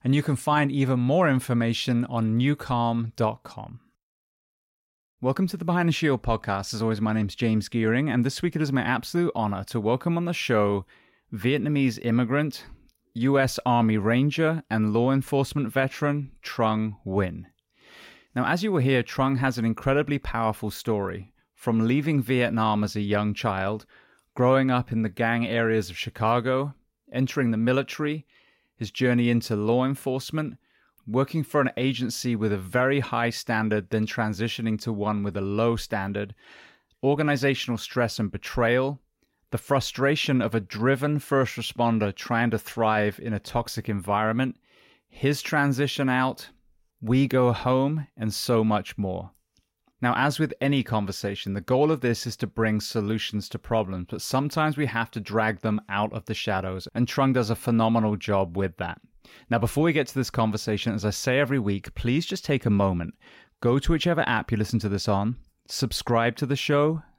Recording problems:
none

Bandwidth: 16 kHz